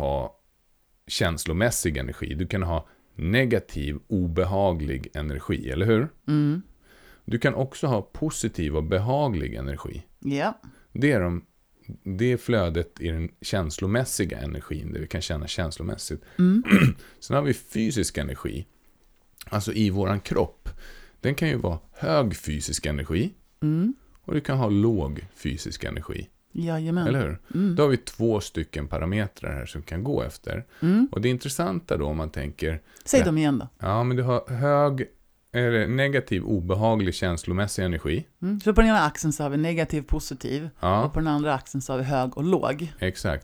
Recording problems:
abrupt cut into speech; at the start

